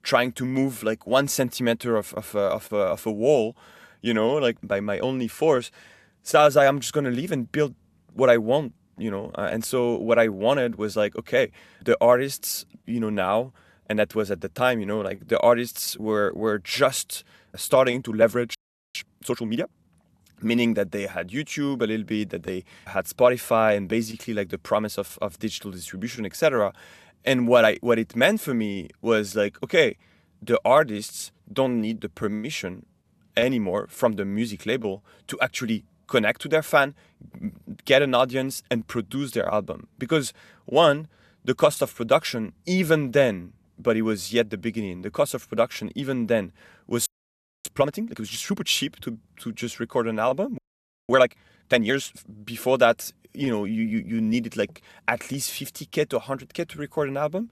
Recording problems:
audio freezing; at 19 s, at 47 s for 0.5 s and at 51 s for 0.5 s

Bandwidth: 13.5 kHz